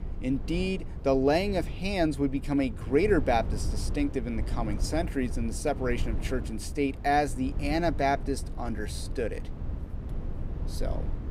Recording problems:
low rumble; noticeable; throughout; 15 dB below the speech

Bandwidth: 15.5 kHz